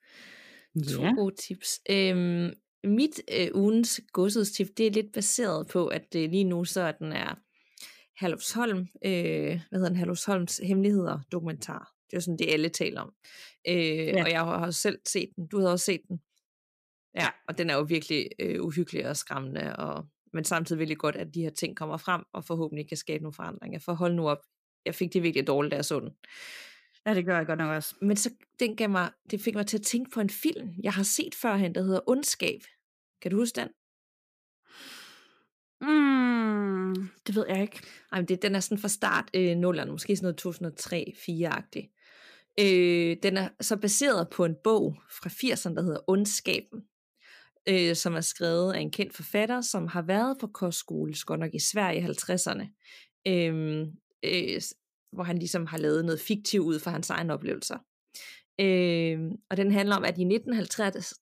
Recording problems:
none

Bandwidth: 15 kHz